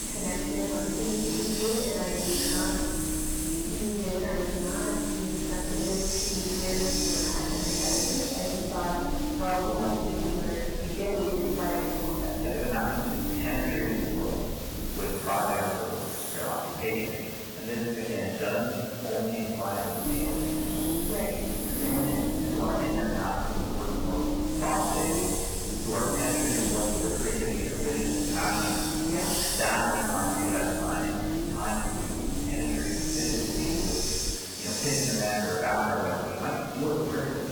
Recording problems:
room echo; strong; dies away in 2 s
off-mic speech; far
garbled, watery; badly; nothing above 3 kHz
distortion; slight; 13% of the sound clipped
hiss; loud; throughout; 1 dB below the speech
low rumble; loud; until 15 s and from 20 to 34 s; 6 dB below the speech
uneven, jittery; strongly; from 1 to 34 s

